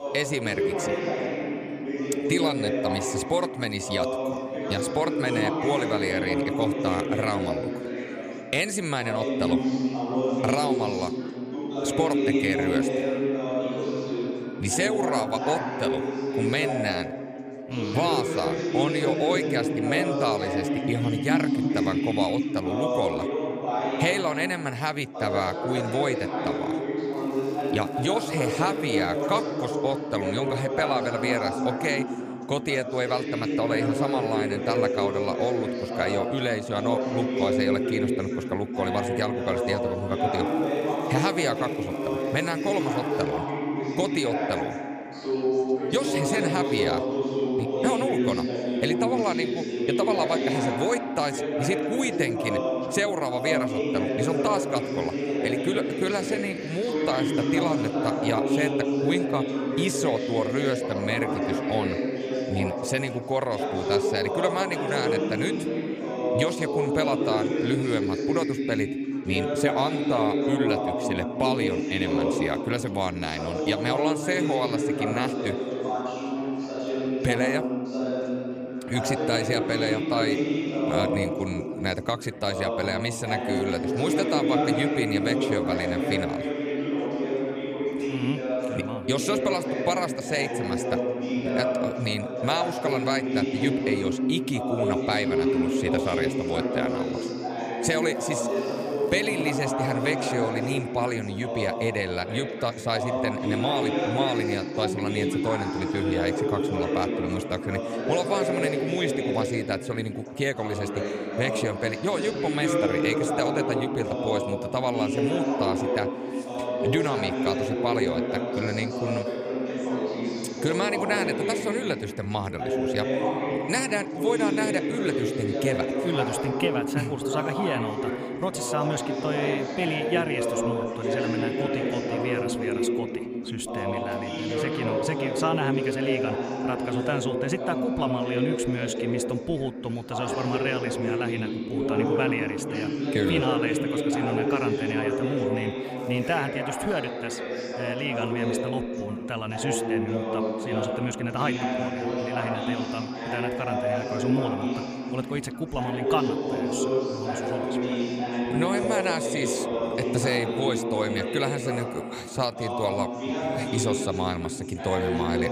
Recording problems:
chatter from many people; very loud; throughout; 1 dB above the speech
crackling; faint; 4 times, first at 27 s; 25 dB below the speech

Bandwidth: 15 kHz